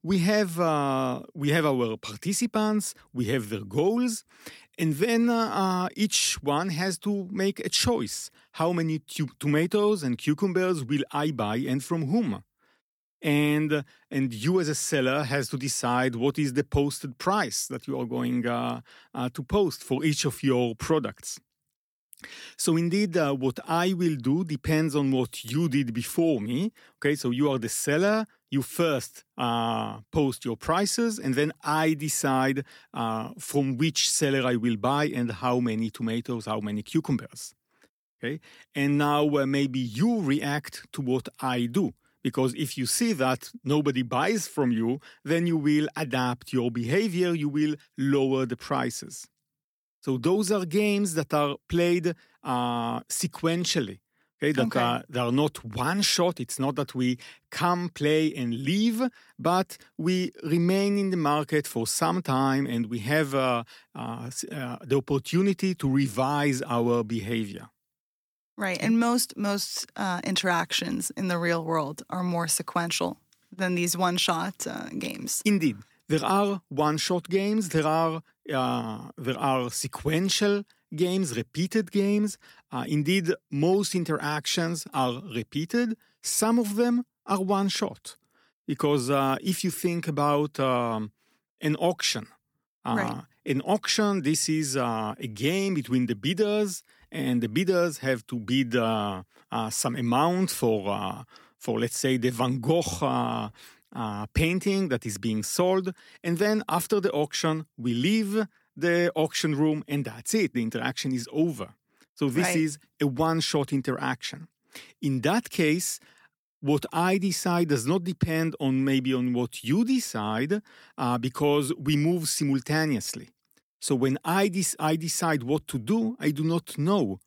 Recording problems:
none

